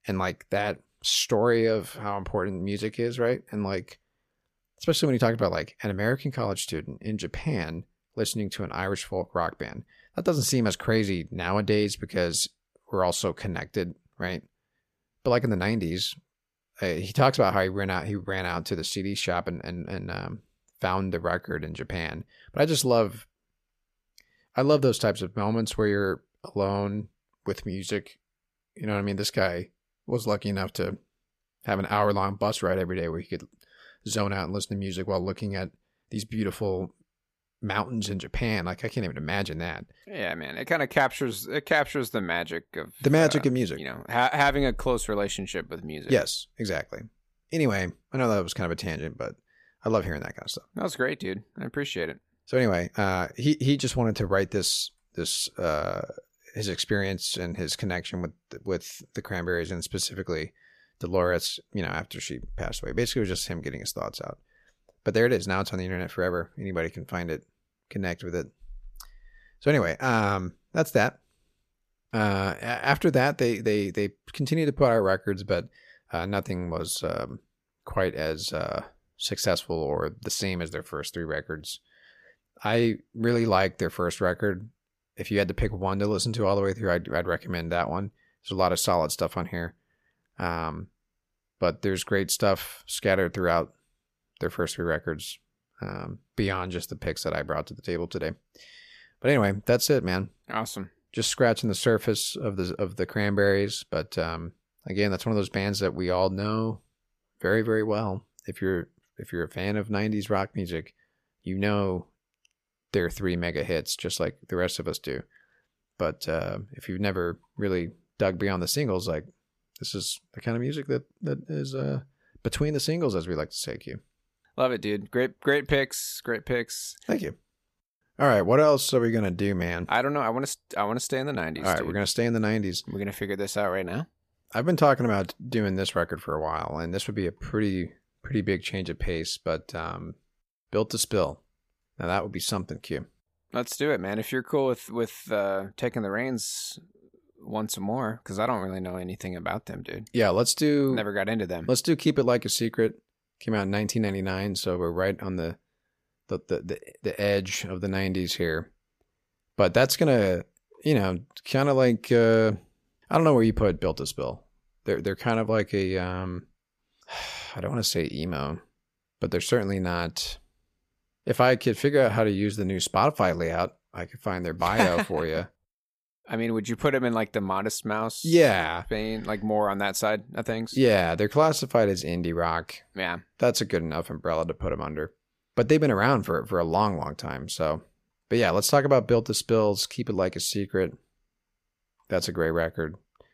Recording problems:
none

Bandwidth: 14.5 kHz